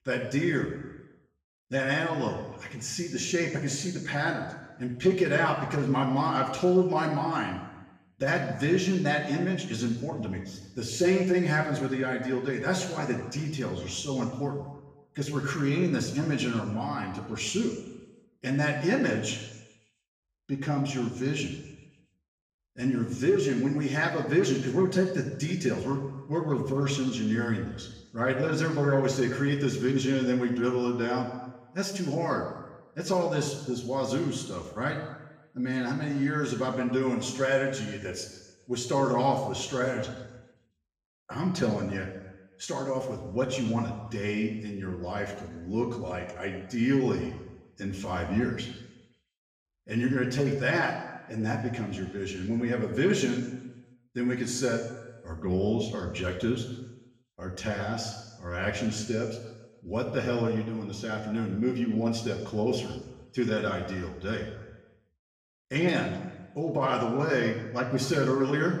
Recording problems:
off-mic speech; far
room echo; noticeable; dies away in 1 s

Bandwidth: 15.5 kHz